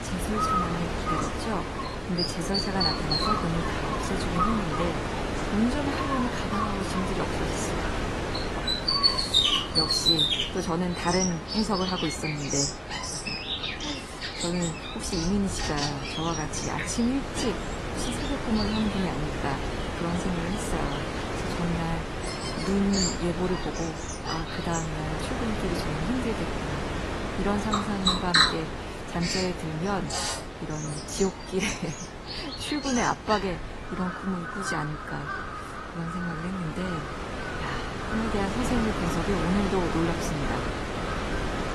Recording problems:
garbled, watery; slightly; nothing above 11.5 kHz
animal sounds; very loud; throughout; 1 dB above the speech
wind noise on the microphone; heavy; as loud as the speech

